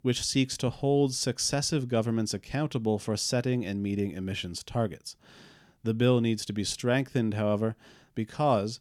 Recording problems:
none

